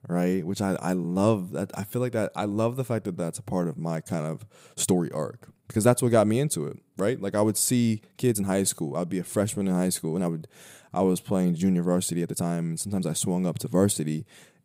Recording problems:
uneven, jittery; strongly; from 1 to 13 s

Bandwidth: 15.5 kHz